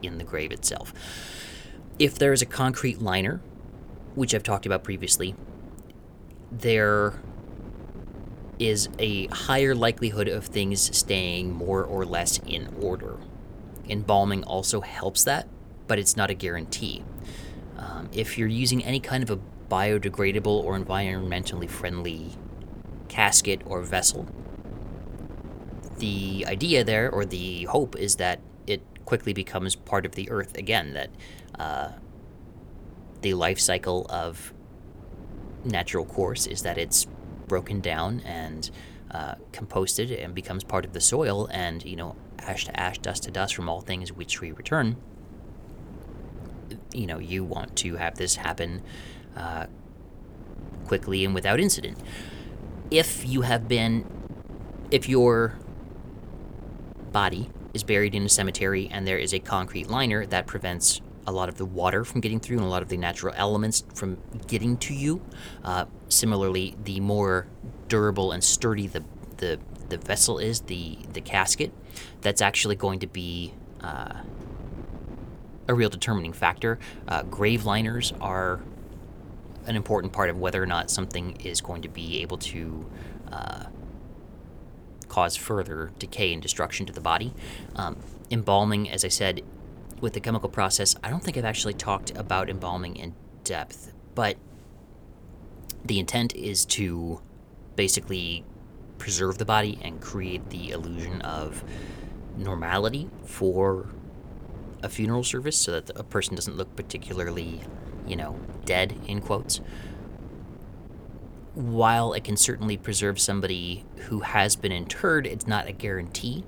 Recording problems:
wind noise on the microphone; occasional gusts; 20 dB below the speech

